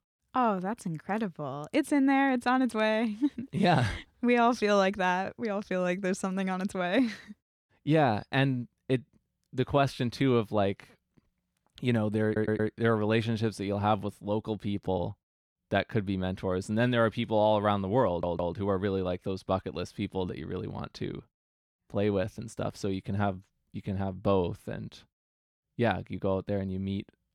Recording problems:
audio stuttering; at 12 s and at 18 s

